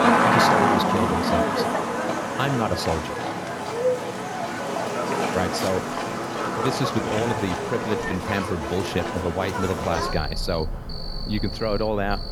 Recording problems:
animal sounds; very loud; throughout; 2 dB above the speech

